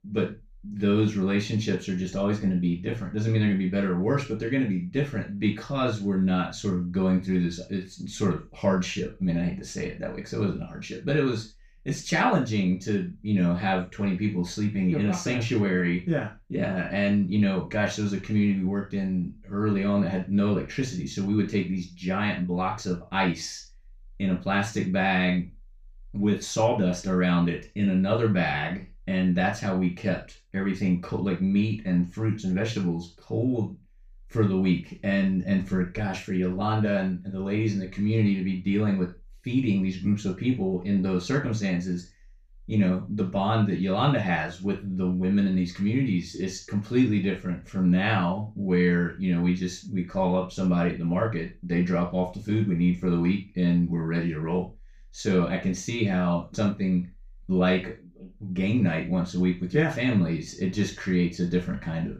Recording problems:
off-mic speech; far
room echo; slight; dies away in 0.3 s

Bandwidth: 15.5 kHz